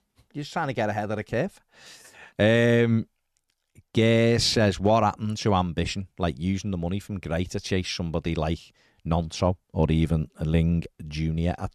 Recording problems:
none

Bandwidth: 13.5 kHz